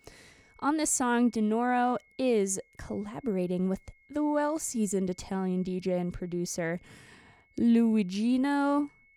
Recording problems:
high-pitched whine; faint; throughout; 2 kHz, 35 dB below the speech

